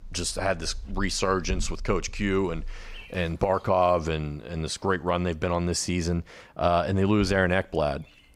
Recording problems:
animal sounds; noticeable; throughout; 20 dB below the speech

